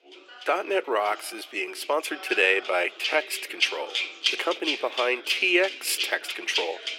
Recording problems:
thin; very; fading below 350 Hz
background music; loud; throughout; 4 dB below the speech
background chatter; noticeable; throughout; 2 voices, 20 dB below the speech
uneven, jittery; strongly; from 1 to 6.5 s

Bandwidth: 16 kHz